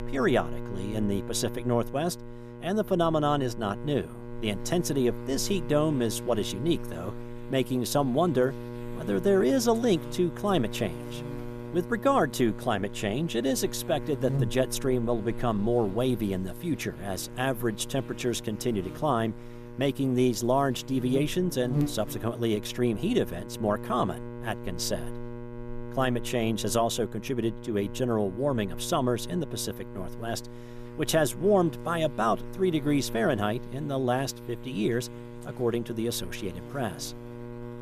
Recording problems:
electrical hum; noticeable; throughout; 60 Hz, 15 dB below the speech

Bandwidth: 14.5 kHz